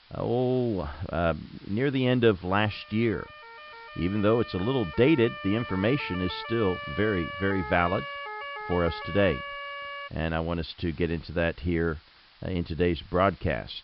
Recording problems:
high frequencies cut off; noticeable; nothing above 5 kHz
hiss; faint; throughout; 25 dB below the speech
siren; noticeable; from 2.5 to 10 s; peak 8 dB below the speech

